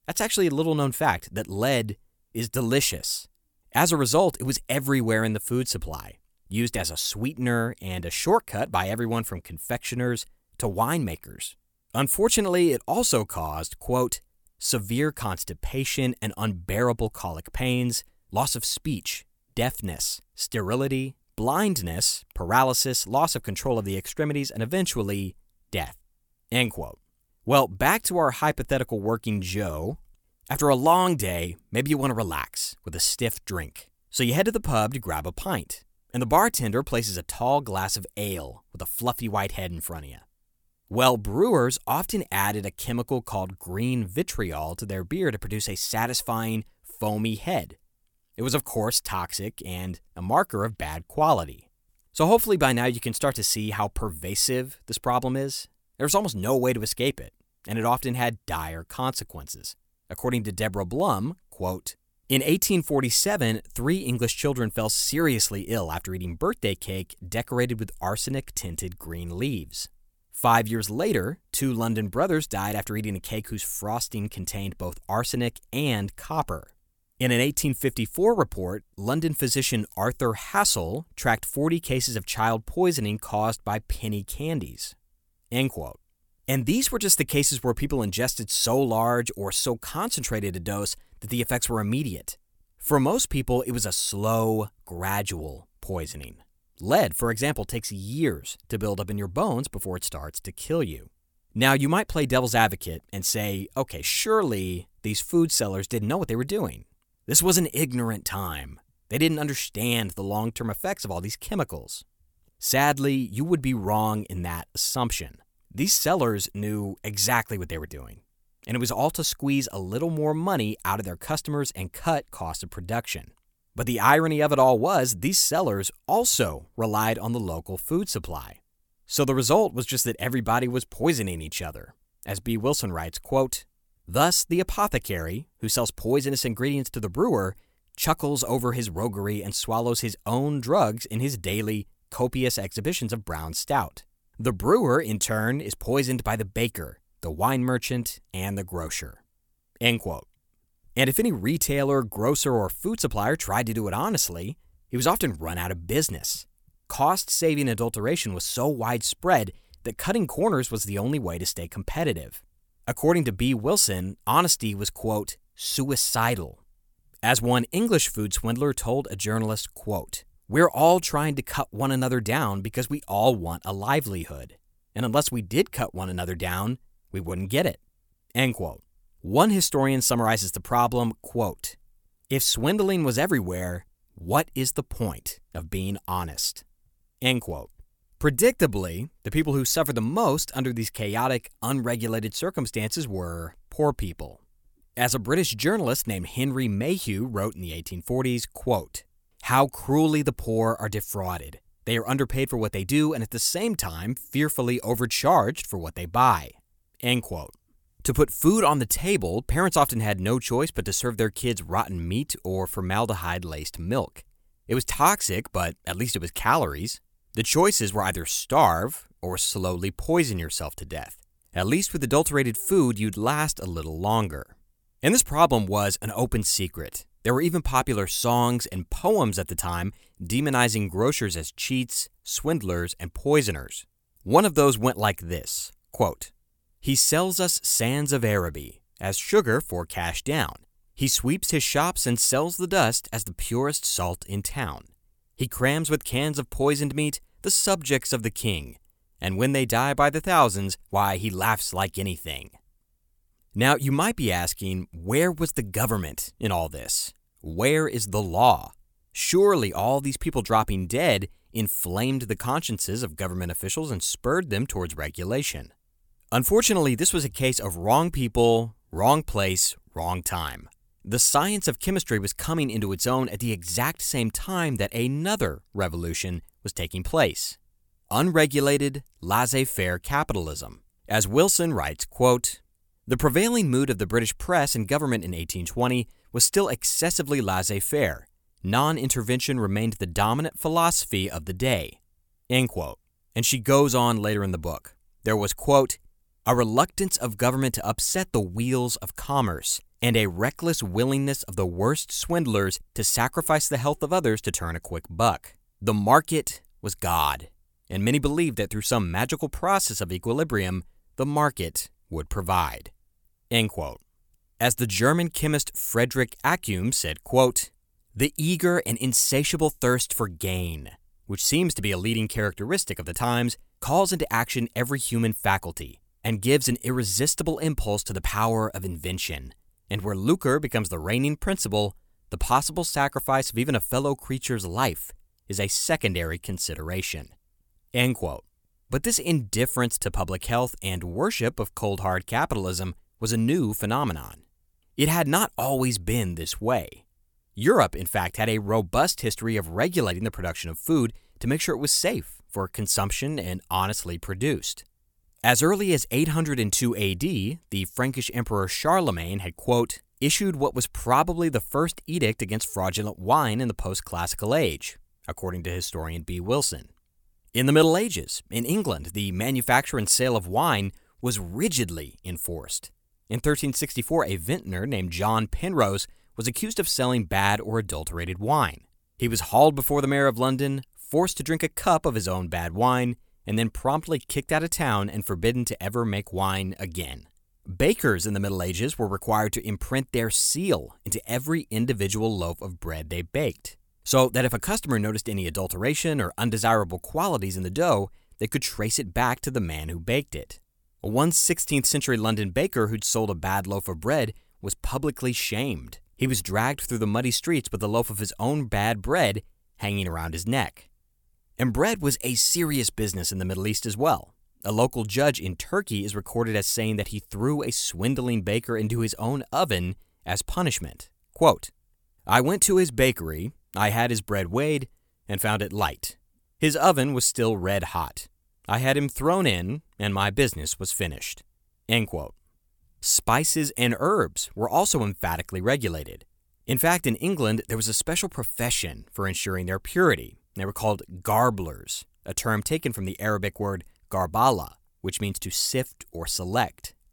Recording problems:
none

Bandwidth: 18 kHz